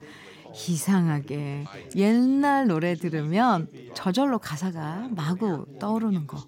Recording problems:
background chatter; faint; throughout; 3 voices, 20 dB below the speech

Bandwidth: 16 kHz